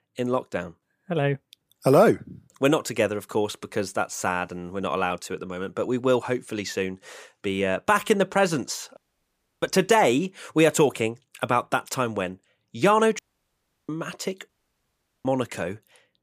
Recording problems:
audio cutting out; at 9 s for 0.5 s, at 13 s for 0.5 s and at 14 s for 1 s

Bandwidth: 15 kHz